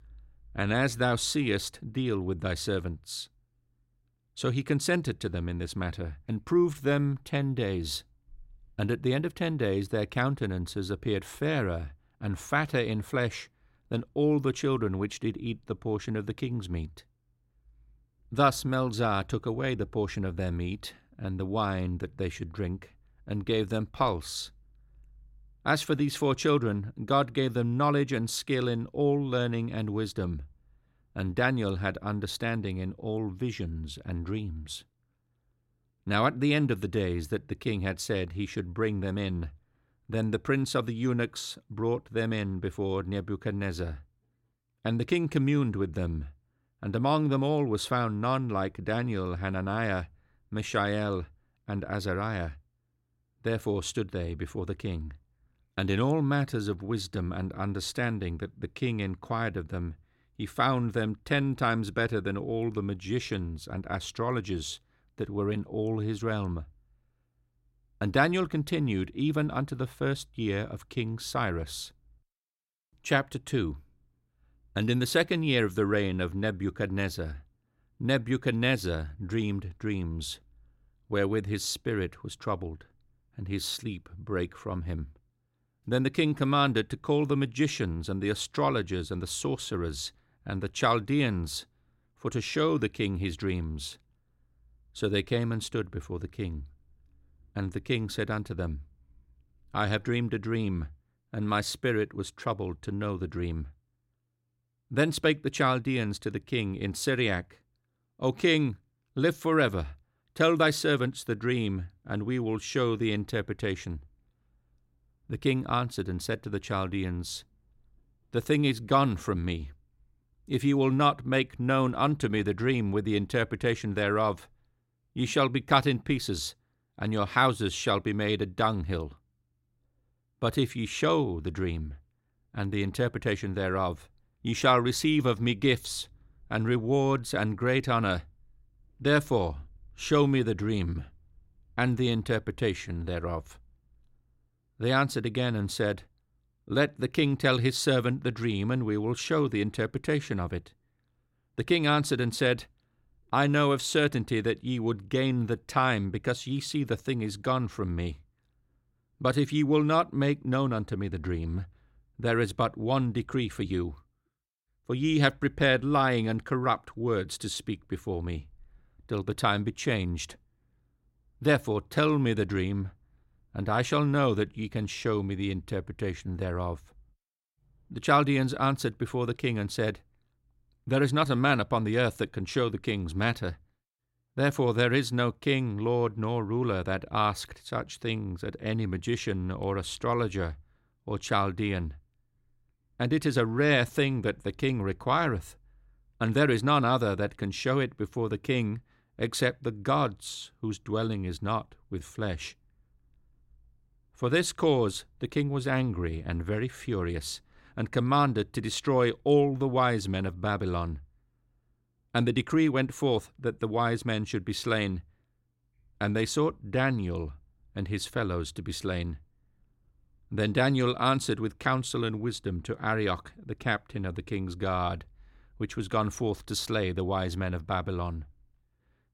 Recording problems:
none

